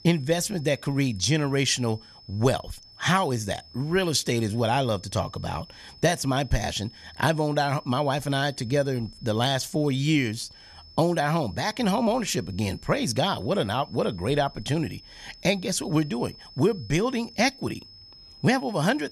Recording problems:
high-pitched whine; faint; throughout; 5 kHz, 20 dB below the speech

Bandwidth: 14 kHz